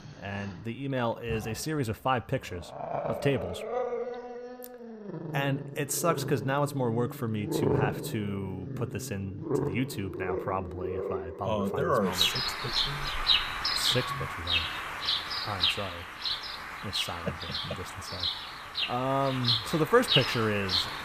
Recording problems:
animal sounds; very loud; throughout; 1 dB above the speech

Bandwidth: 15 kHz